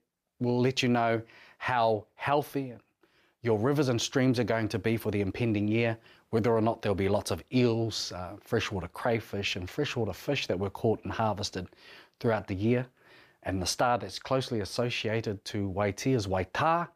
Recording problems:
none

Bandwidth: 15 kHz